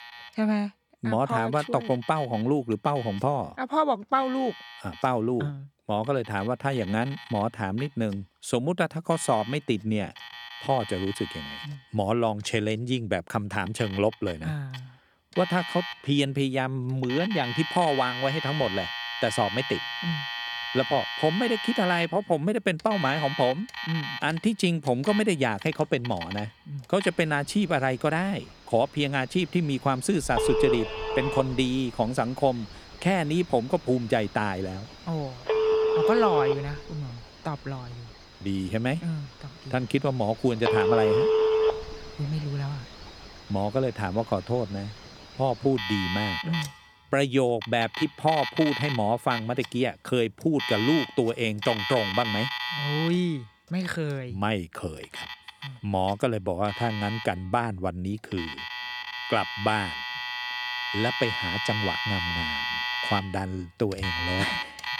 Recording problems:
alarms or sirens; loud; throughout; 3 dB below the speech

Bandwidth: 18.5 kHz